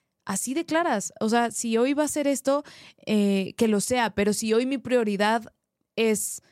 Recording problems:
none

